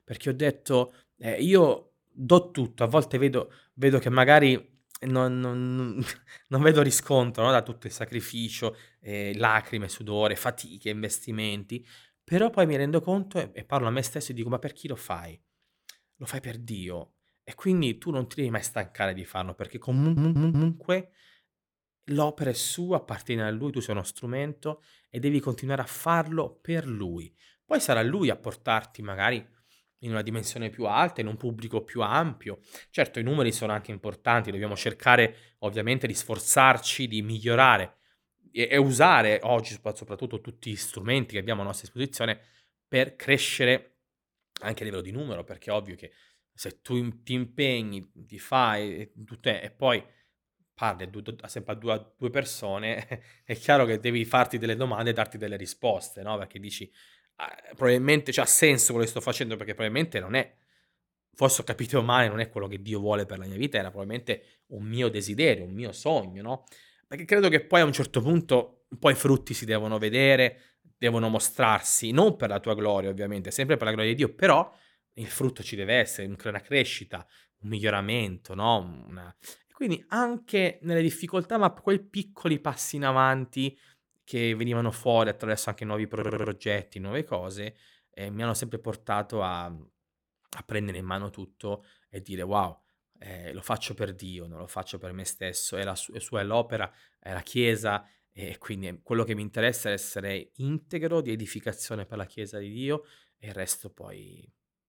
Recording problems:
audio stuttering; at 20 s and at 1:26

